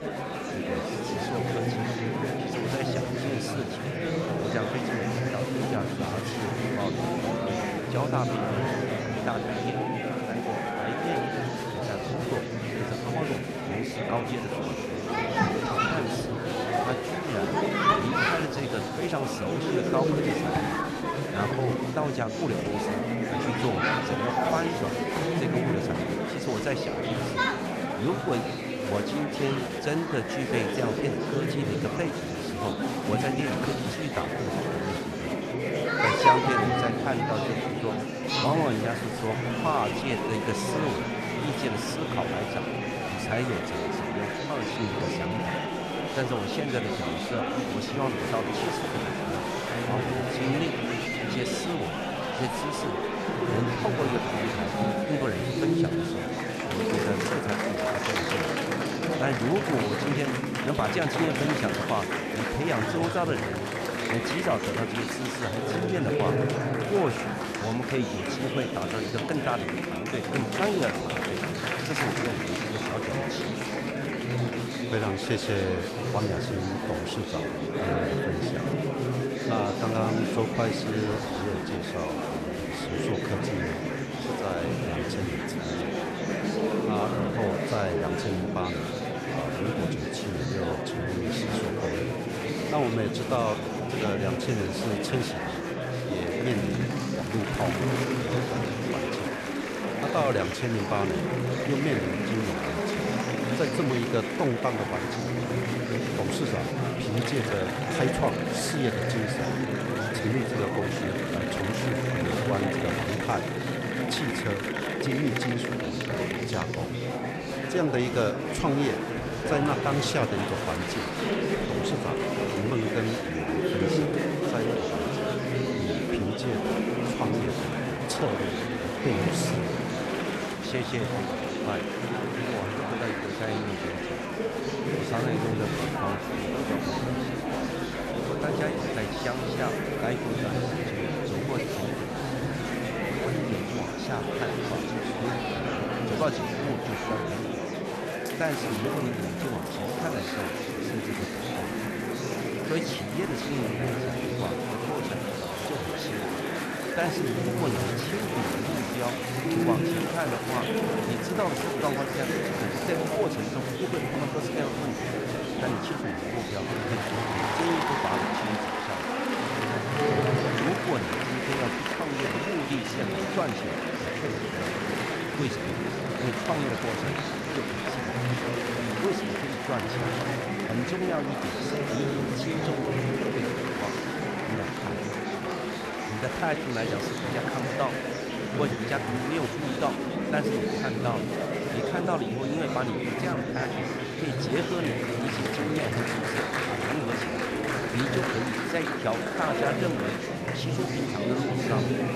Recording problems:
murmuring crowd; very loud; throughout; 4 dB above the speech

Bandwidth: 13.5 kHz